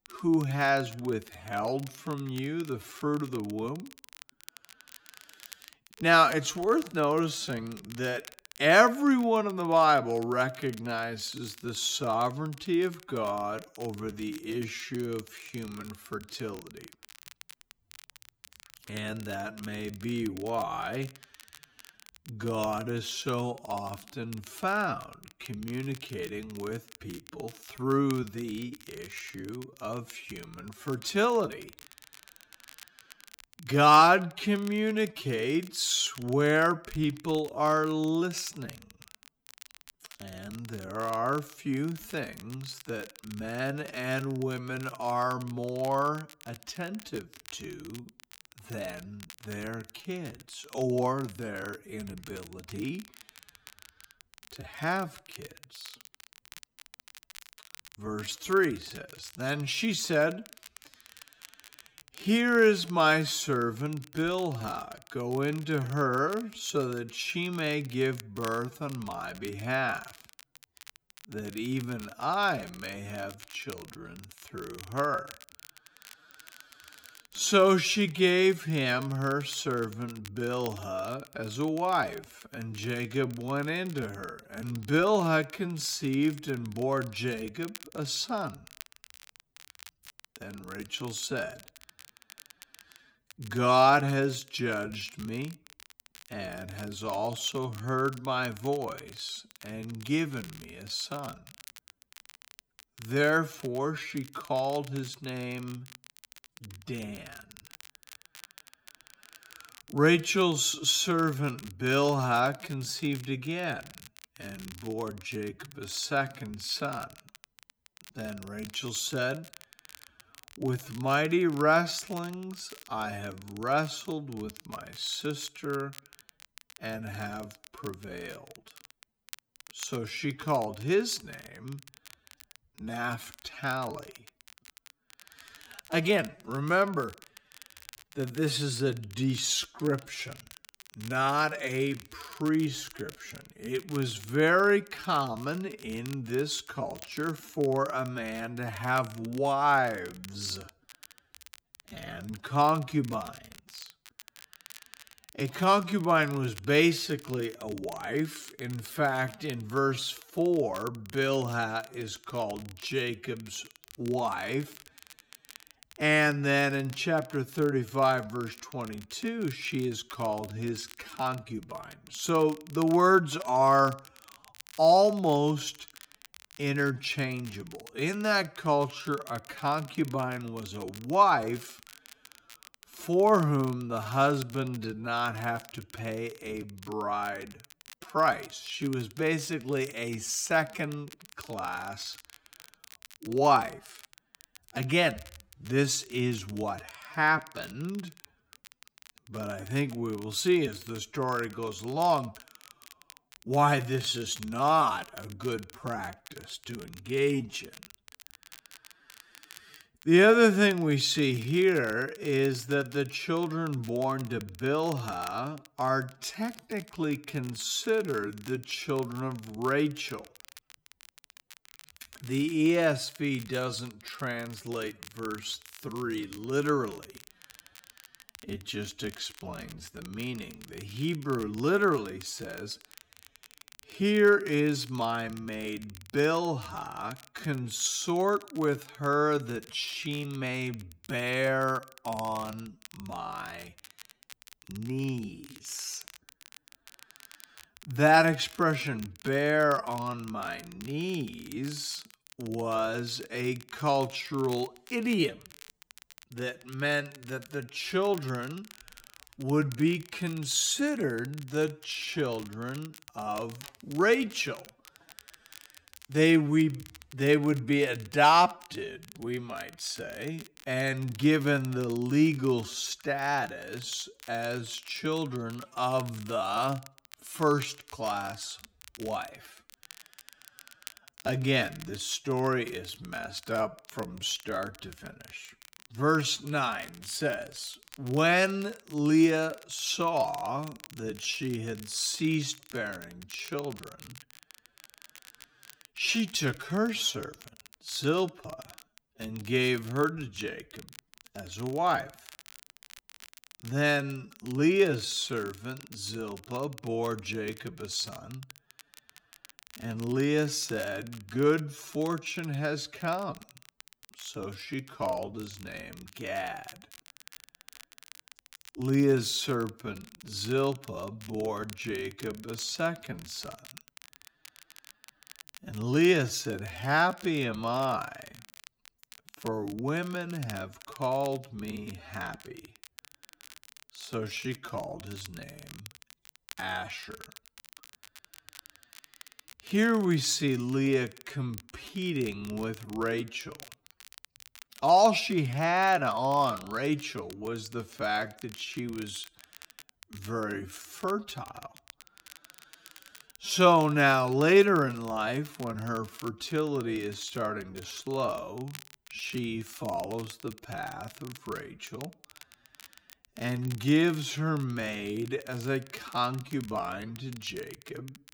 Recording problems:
wrong speed, natural pitch; too slow; 0.6 times normal speed
crackle, like an old record; faint; 20 dB below the speech

